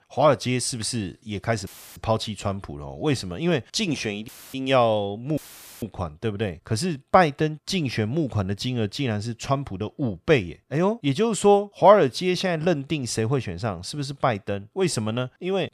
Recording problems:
audio cutting out; filled with static; at 1.5 s, at 4.5 s and at 5.5 s

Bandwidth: 14.5 kHz